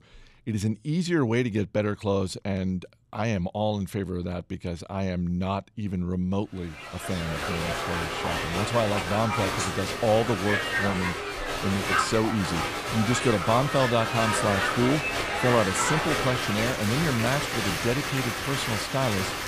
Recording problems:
crowd noise; loud; from 7 s on; as loud as the speech

